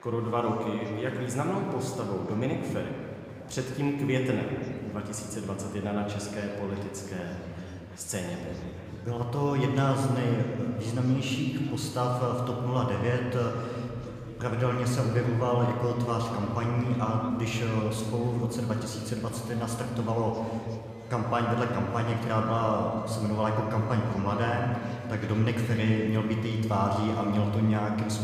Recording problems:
room echo; noticeable; dies away in 2.1 s
off-mic speech; somewhat distant
murmuring crowd; faint; throughout; 20 dB below the speech
background music; very faint; from 14 s on; 30 dB below the speech

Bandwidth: 15 kHz